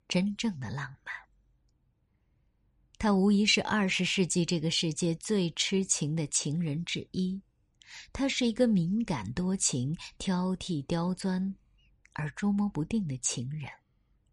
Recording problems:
none

